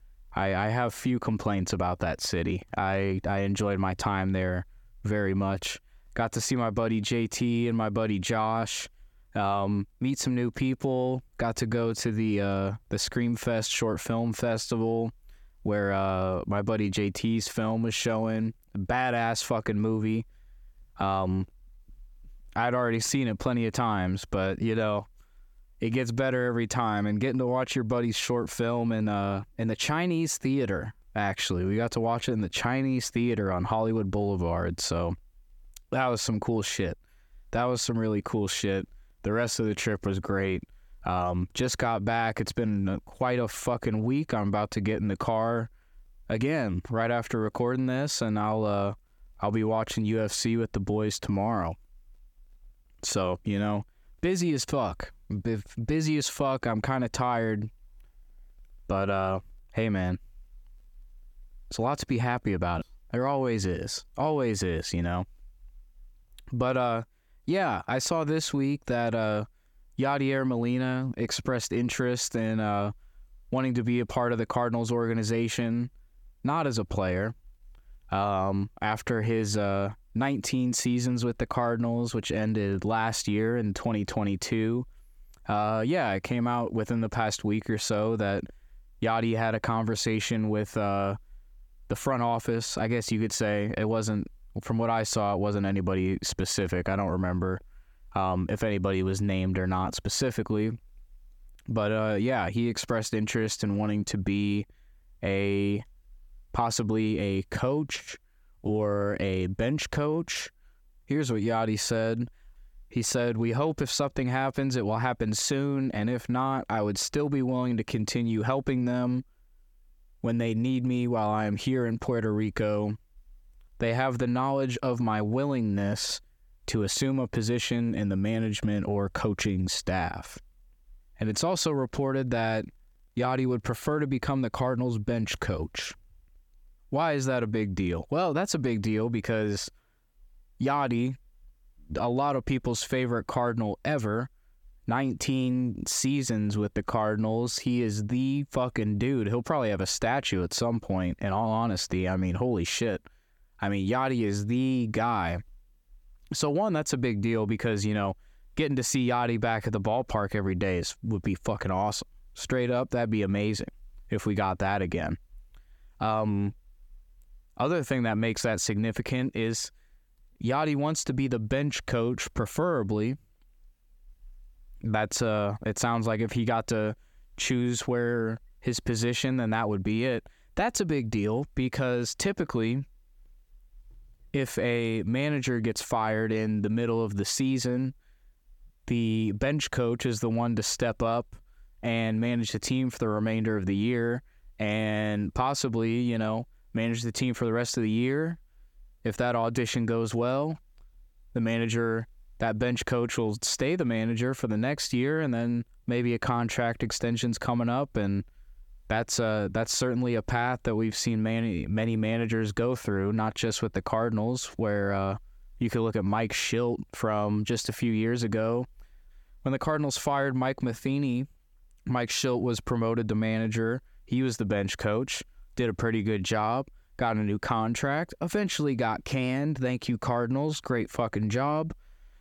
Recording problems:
squashed, flat; heavily

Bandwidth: 17.5 kHz